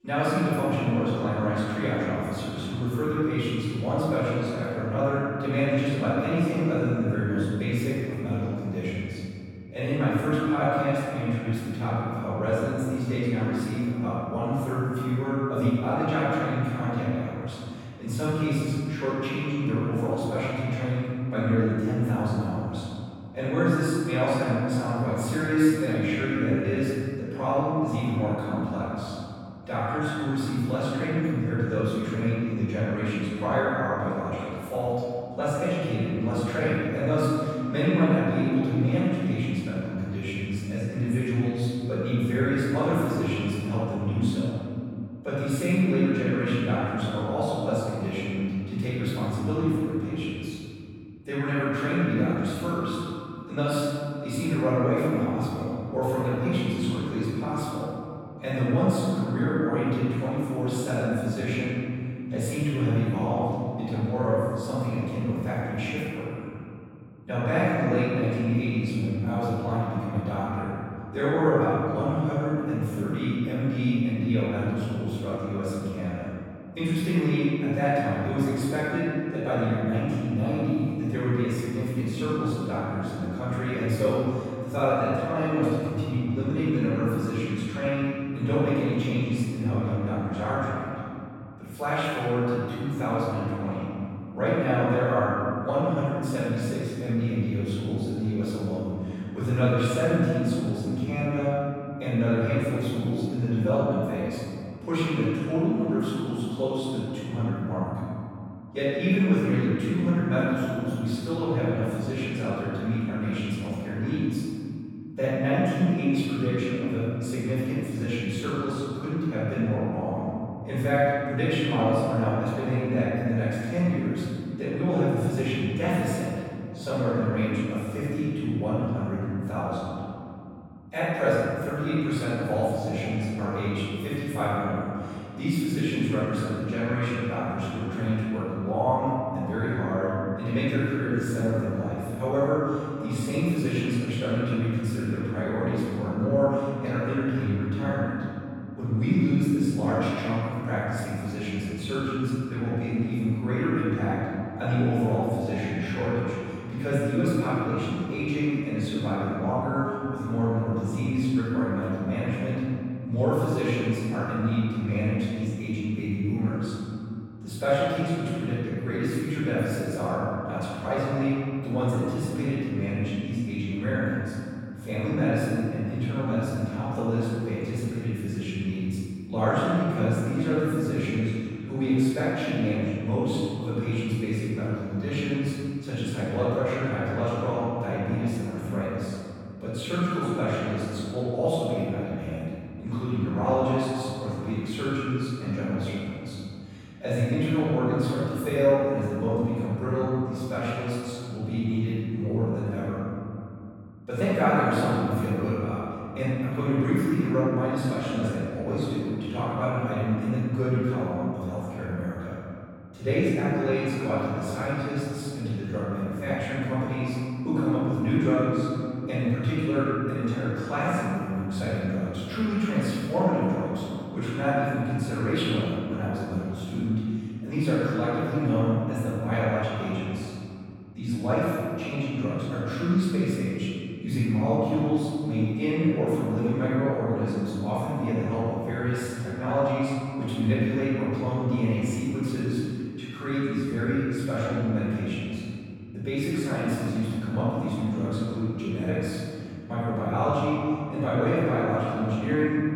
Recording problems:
room echo; strong; dies away in 2.8 s
off-mic speech; far

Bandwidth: 17.5 kHz